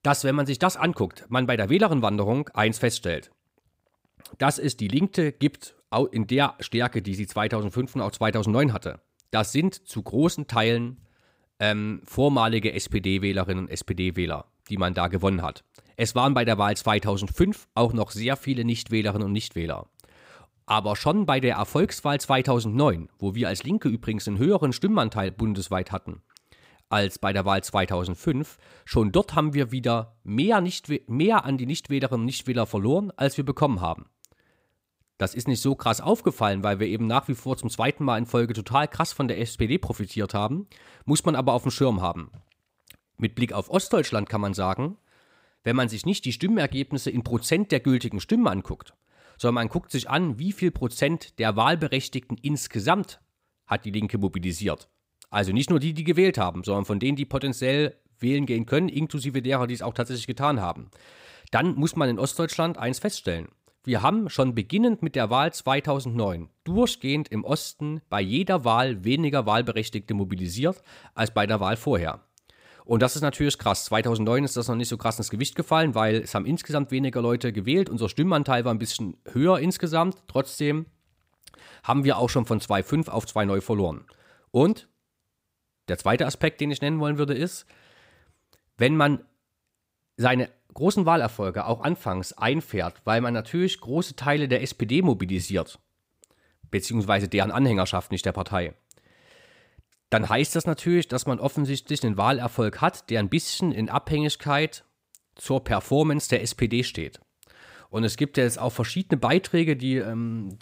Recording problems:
none

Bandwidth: 15.5 kHz